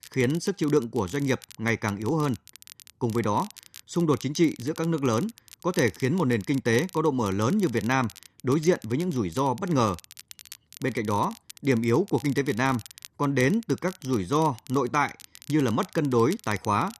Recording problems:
crackle, like an old record; noticeable; 20 dB below the speech

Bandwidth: 13.5 kHz